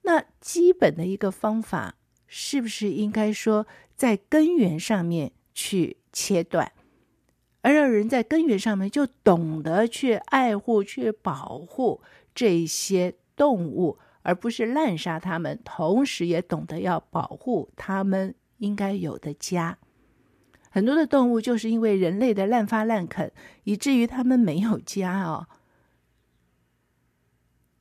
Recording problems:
none

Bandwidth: 14.5 kHz